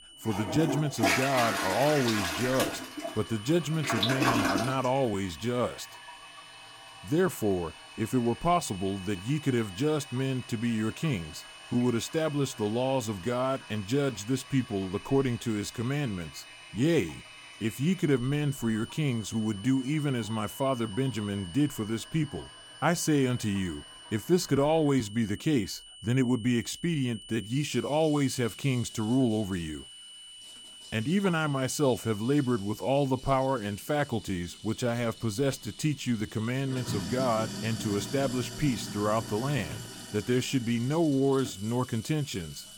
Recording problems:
household noises; loud; throughout; 7 dB below the speech
high-pitched whine; noticeable; throughout; 3 kHz, 20 dB below the speech

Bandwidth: 17 kHz